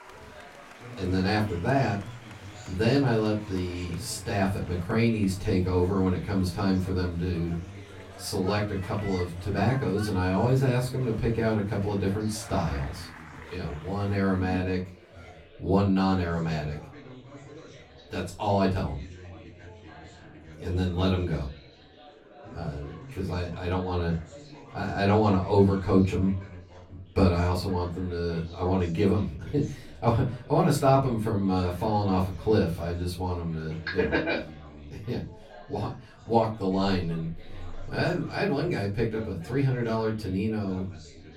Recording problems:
off-mic speech; far
room echo; slight; dies away in 0.3 s
chatter from many people; noticeable; throughout; 20 dB below the speech

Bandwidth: 16 kHz